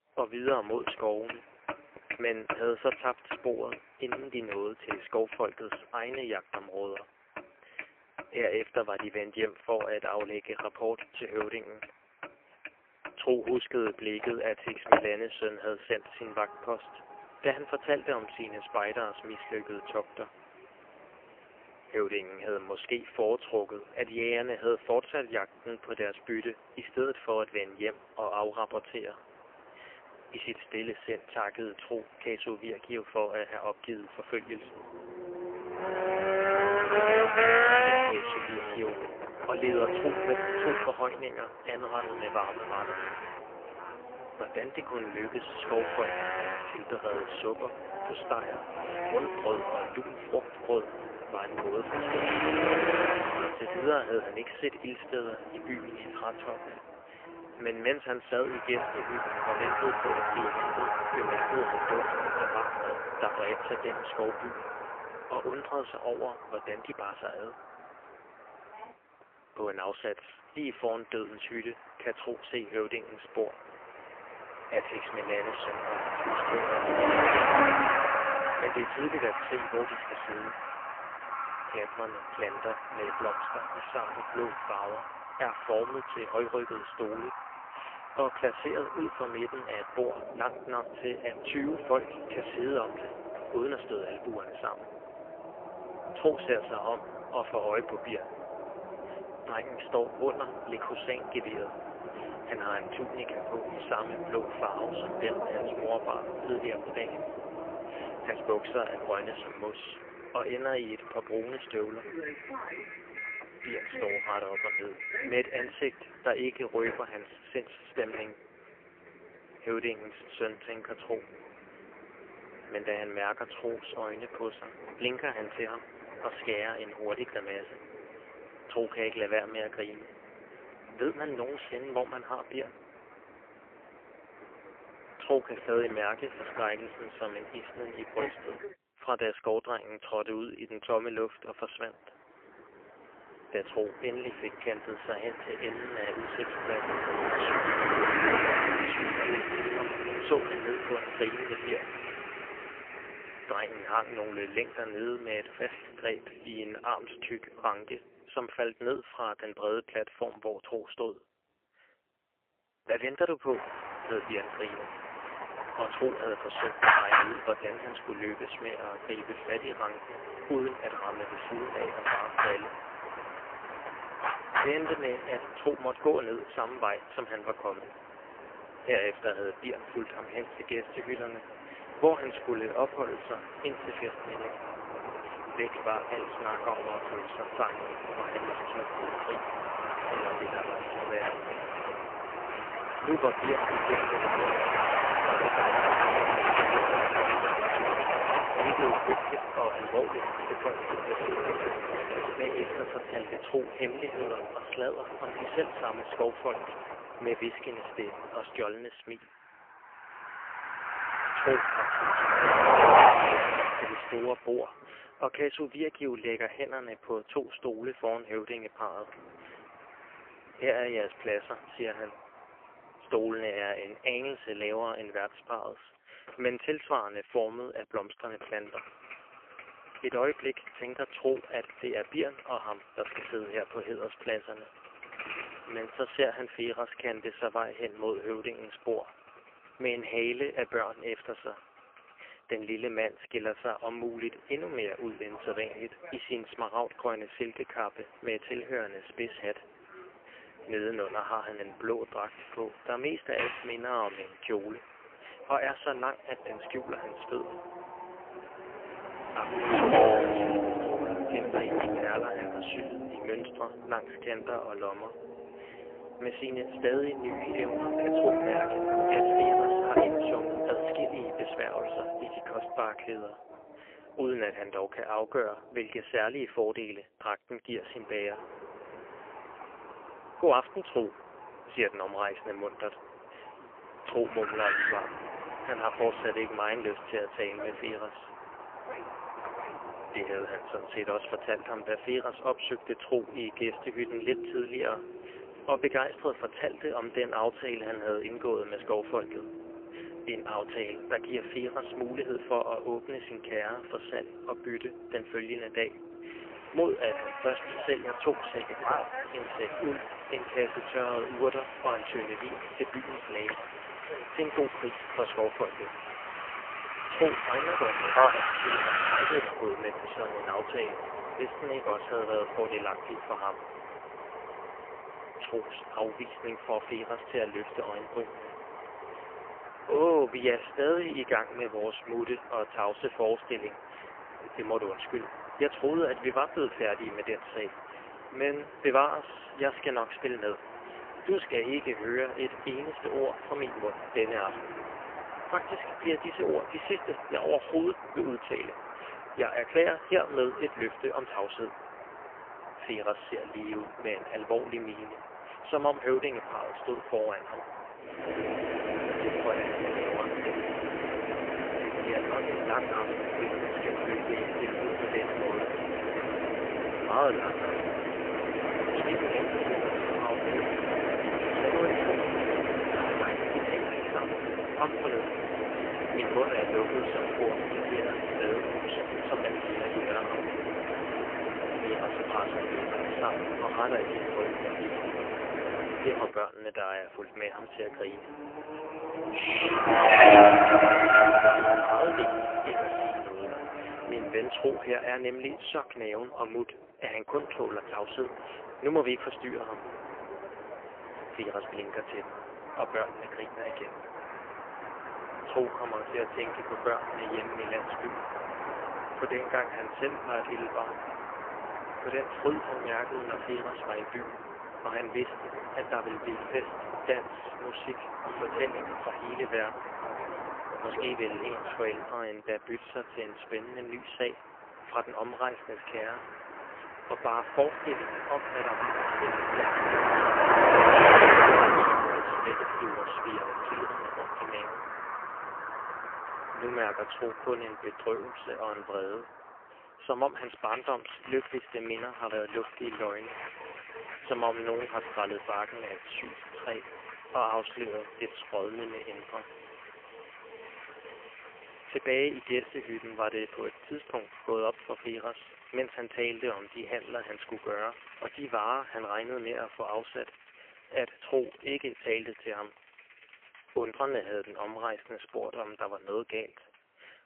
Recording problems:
phone-call audio; poor line; nothing above 3 kHz
traffic noise; very loud; throughout; 4 dB above the speech

